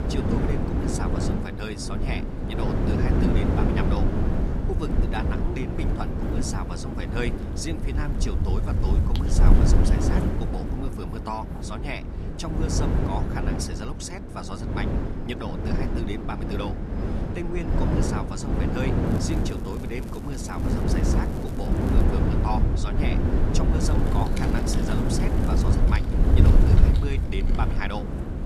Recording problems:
wind noise on the microphone; heavy; 2 dB above the speech
crackling; noticeable; from 19 to 22 s and from 24 to 26 s; 20 dB below the speech
dog barking; noticeable; from 7.5 to 12 s; peak 8 dB below the speech
keyboard typing; noticeable; from 24 s on; peak 4 dB below the speech

